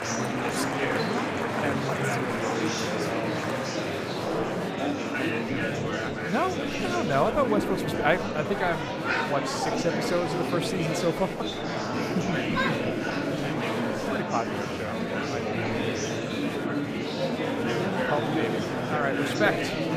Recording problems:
murmuring crowd; very loud; throughout; 2 dB above the speech

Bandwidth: 15 kHz